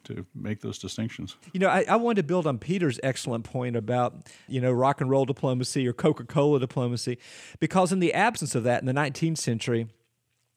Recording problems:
none

